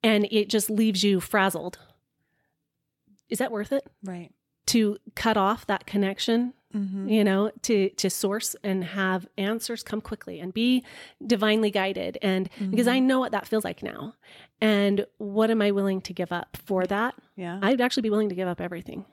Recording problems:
uneven, jittery; strongly; from 3.5 to 18 s

